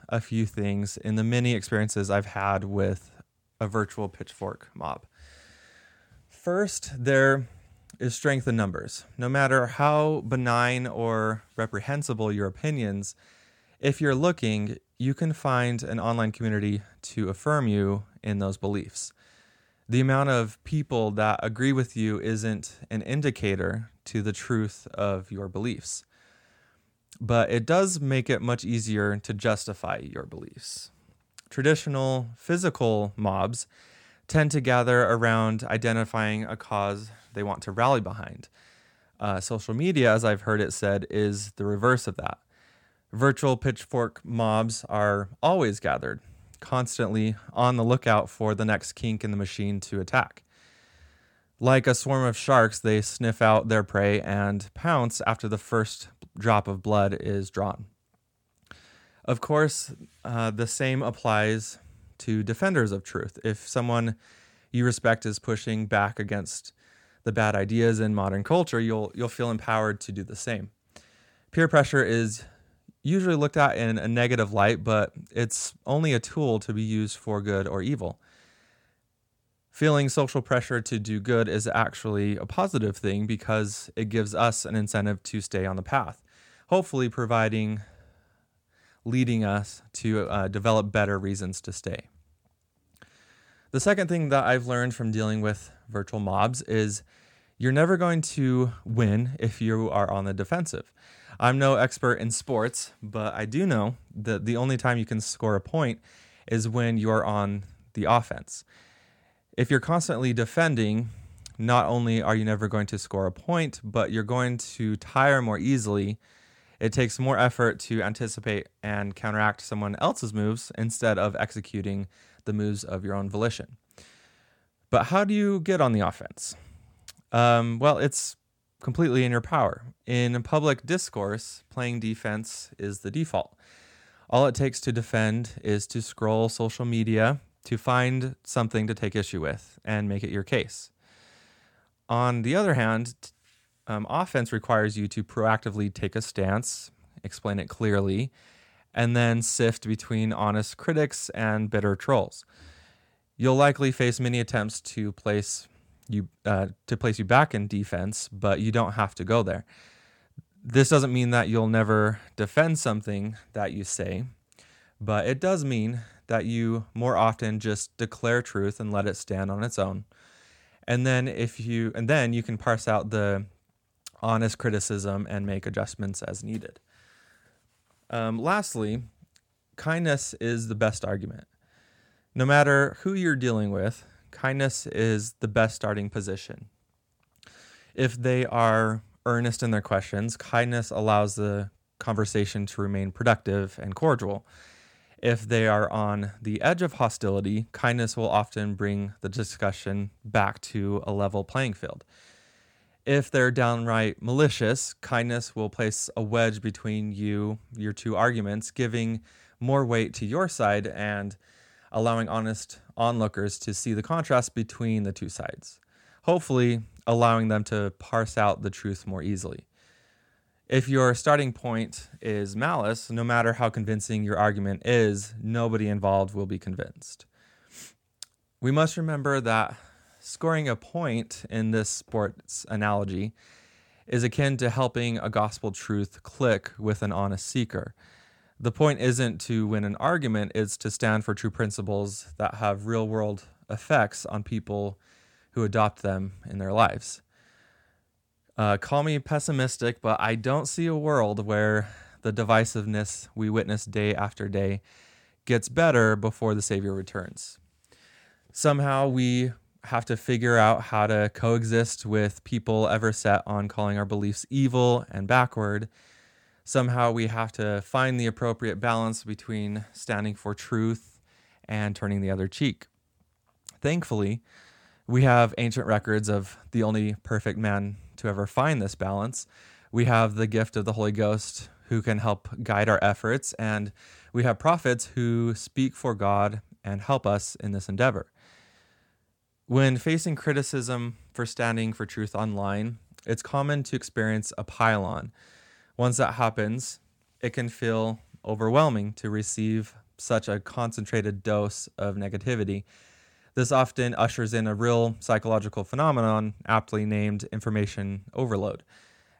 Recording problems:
none

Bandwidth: 17 kHz